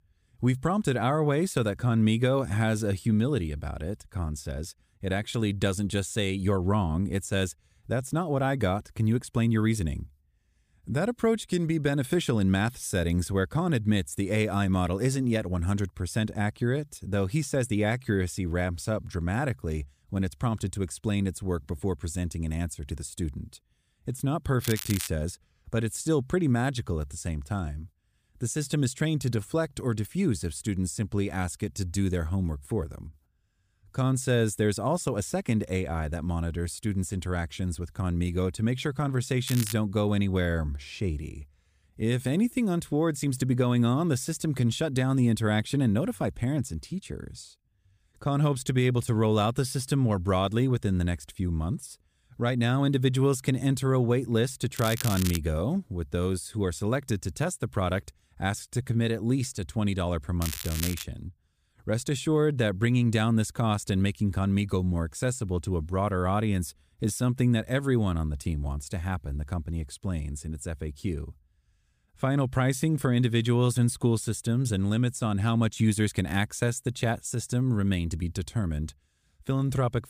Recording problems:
crackling; loud; 4 times, first at 25 s; 8 dB below the speech

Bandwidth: 15 kHz